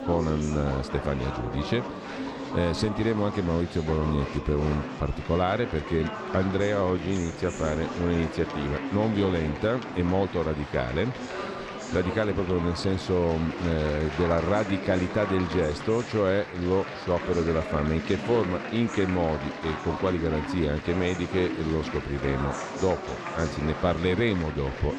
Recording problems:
murmuring crowd; loud; throughout; 7 dB below the speech

